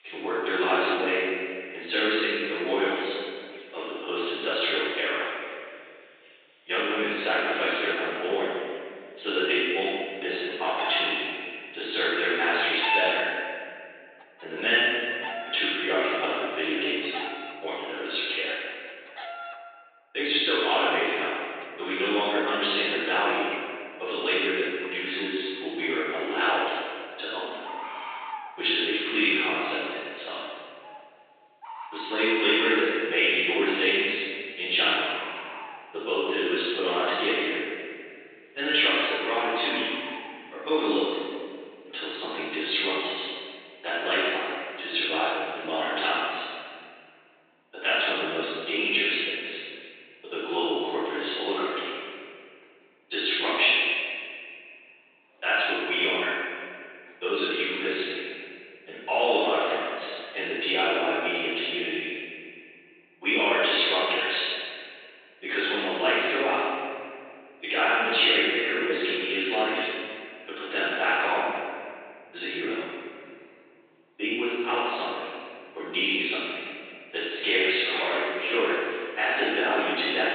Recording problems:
room echo; strong; dies away in 2.3 s
off-mic speech; far
thin; very; fading below 300 Hz
high frequencies cut off; severe; nothing above 4 kHz
animal sounds; noticeable; throughout; 15 dB below the speech

